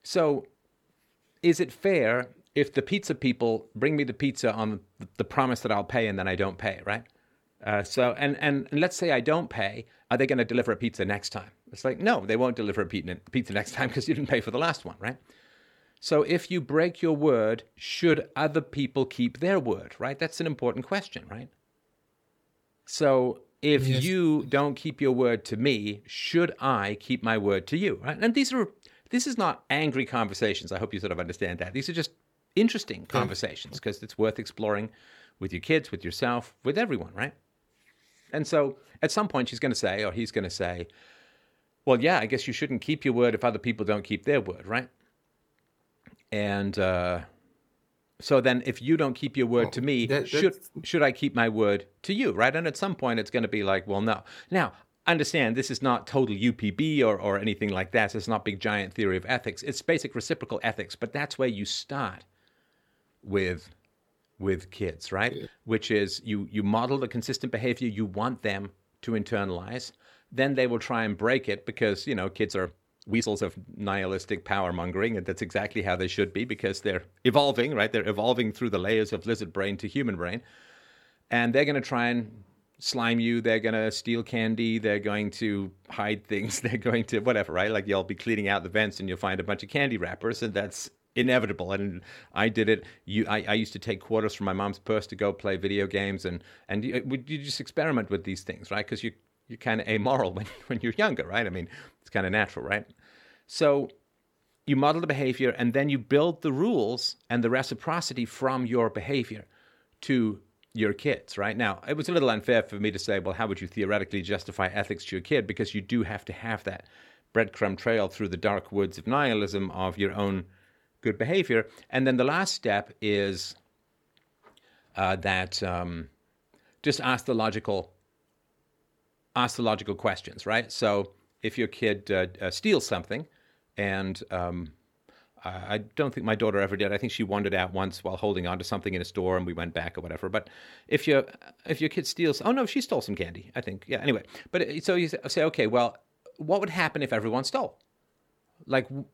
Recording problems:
uneven, jittery; strongly; from 7.5 s to 2:15

